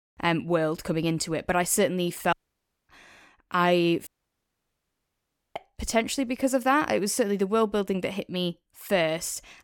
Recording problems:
audio cutting out; at 2.5 s for 0.5 s and at 4 s for 1.5 s

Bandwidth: 17.5 kHz